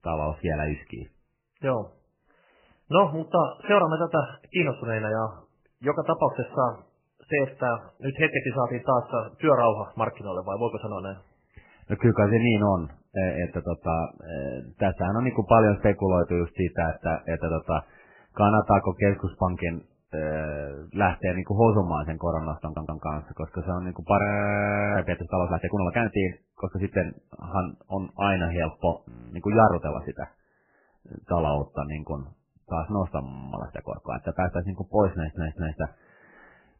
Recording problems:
garbled, watery; badly; nothing above 3 kHz
audio stuttering; at 23 s and at 35 s
audio freezing; at 24 s for 0.5 s, at 29 s and at 33 s

